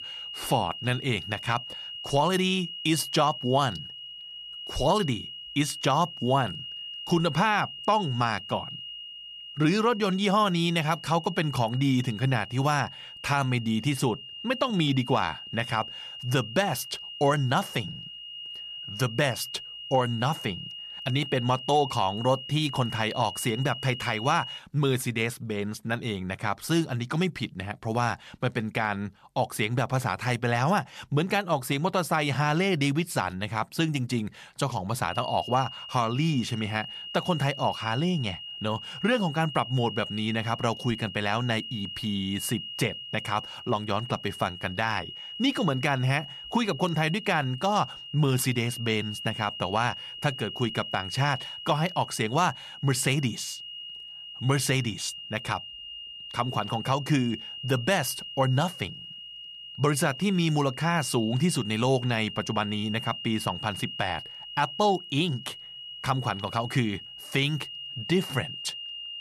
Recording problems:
high-pitched whine; loud; until 25 s and from 35 s on; 3 kHz, 10 dB below the speech

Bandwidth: 14 kHz